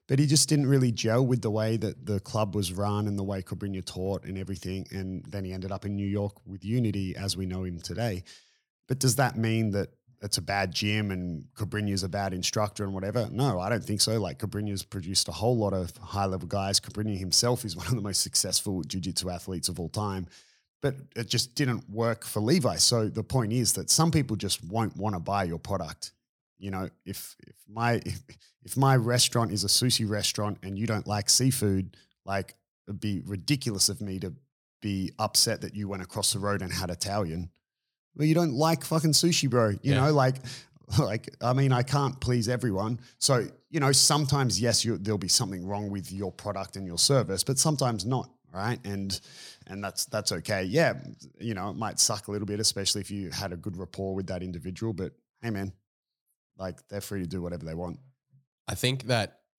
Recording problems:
none

